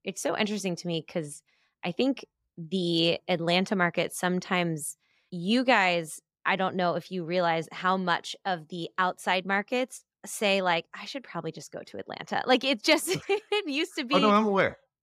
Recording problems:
none

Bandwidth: 15.5 kHz